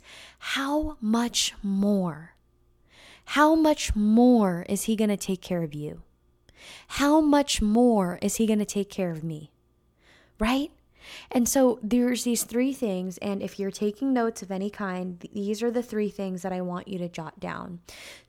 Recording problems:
none

